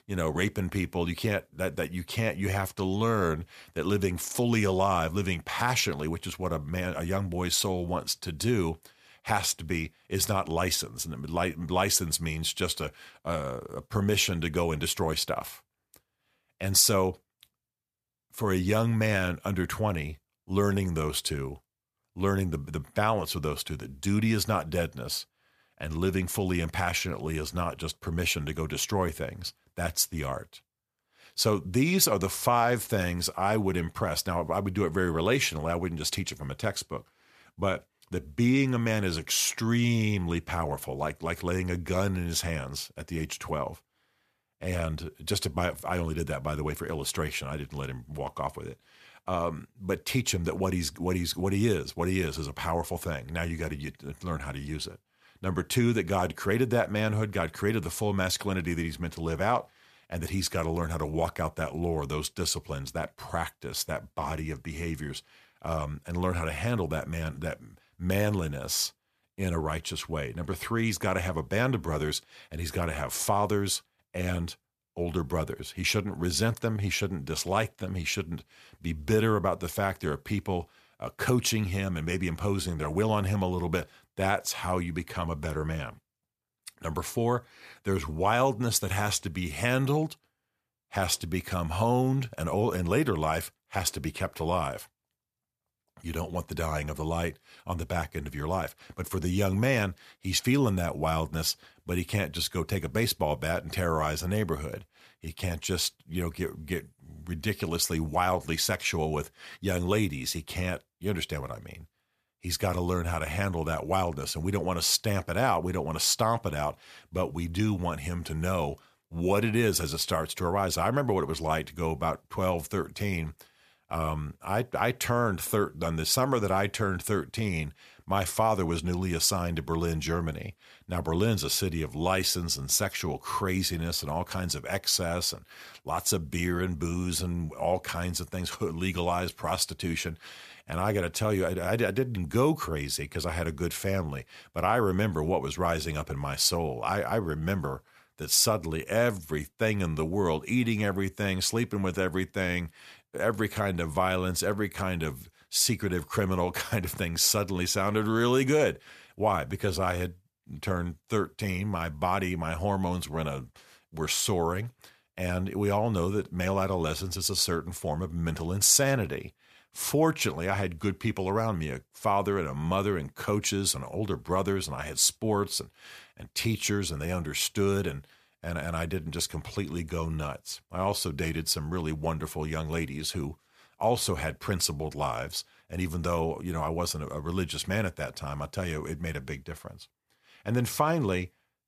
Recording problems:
none

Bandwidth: 14.5 kHz